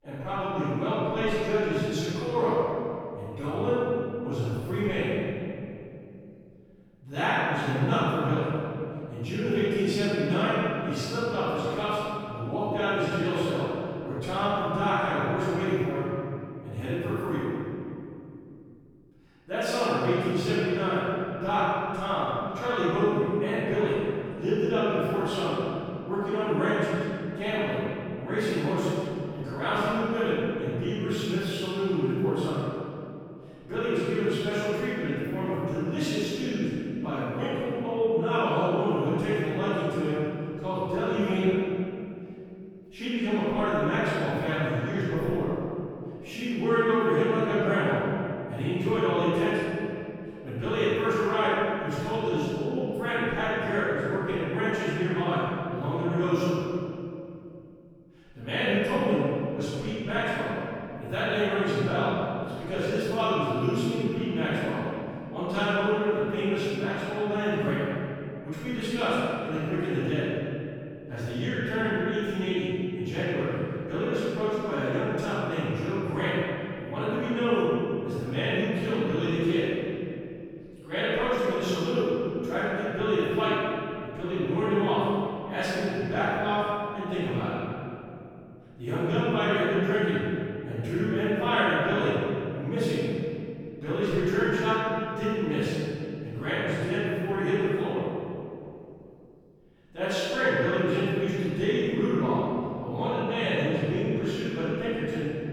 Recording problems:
room echo; strong; dies away in 2.6 s
off-mic speech; far

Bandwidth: 18.5 kHz